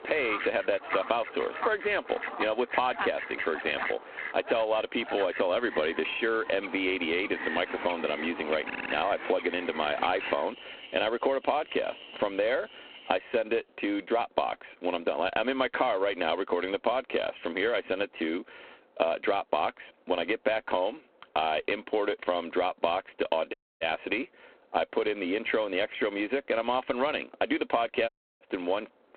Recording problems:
phone-call audio; poor line
squashed, flat; heavily, background pumping
animal sounds; loud; until 13 s; 8 dB below the speech
audio stuttering; at 8.5 s
audio cutting out; at 24 s and at 28 s

